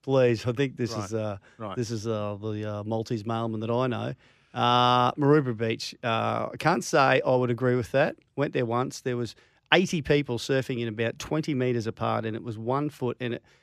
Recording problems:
none

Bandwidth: 14.5 kHz